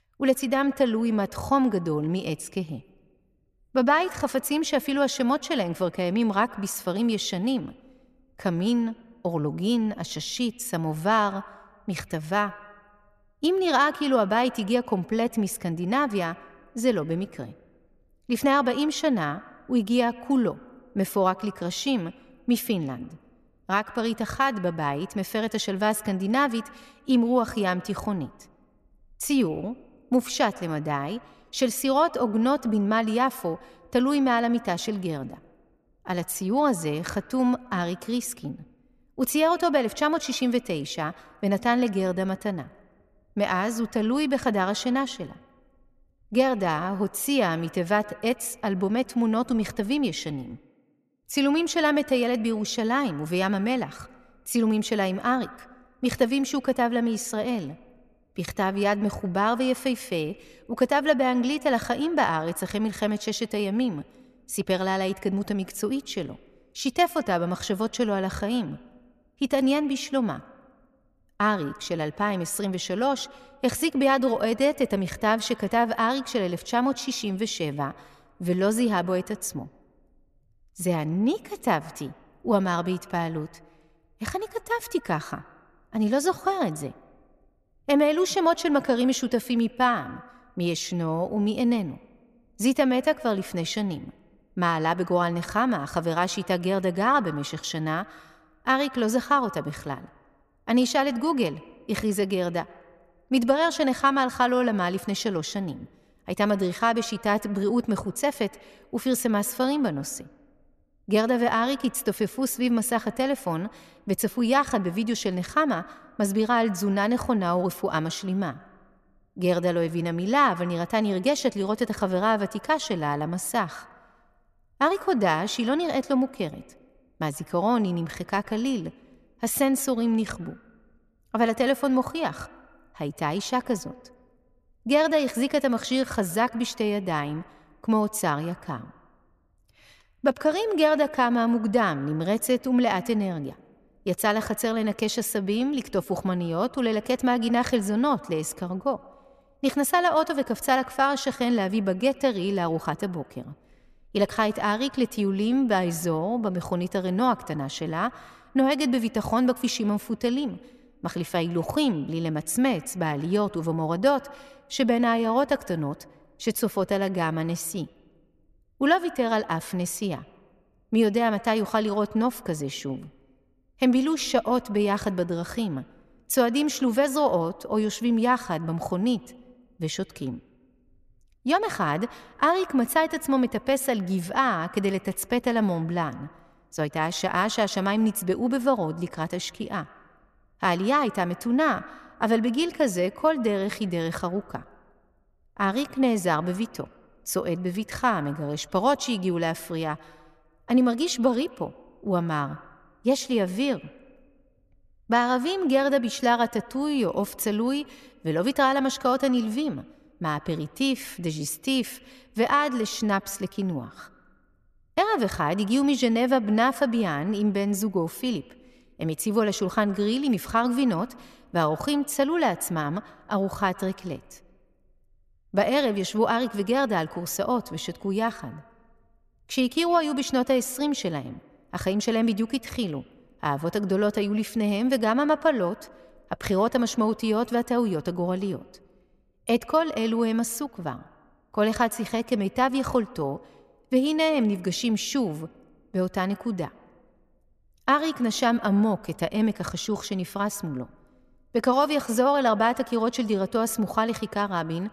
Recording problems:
echo of what is said; faint; throughout; 110 ms later, 20 dB below the speech

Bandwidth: 14 kHz